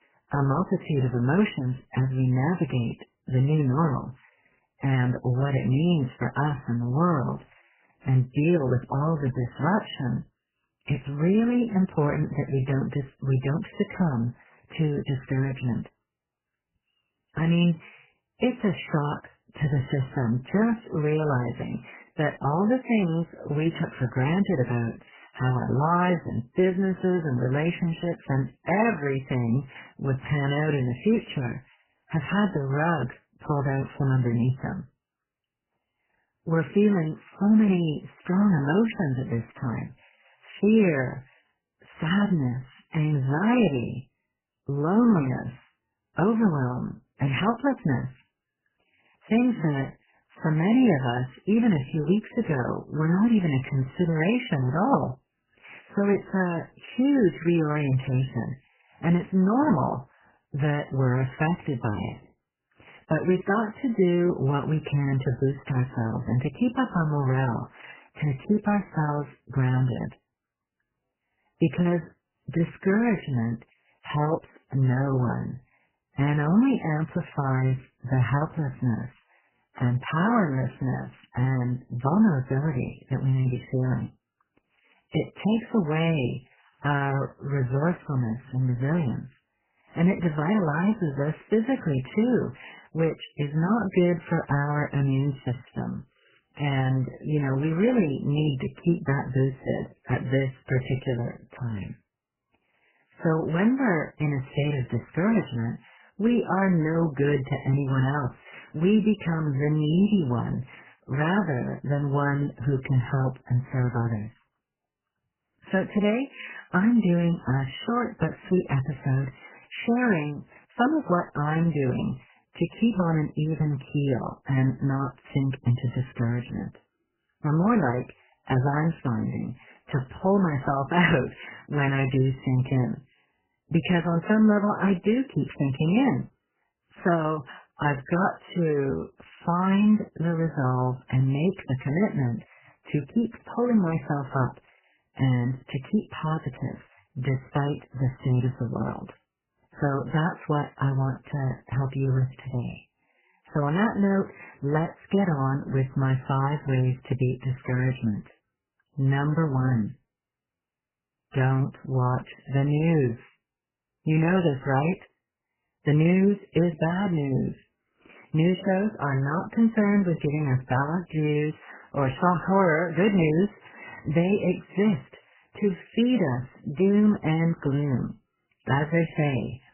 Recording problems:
garbled, watery; badly; nothing above 3 kHz

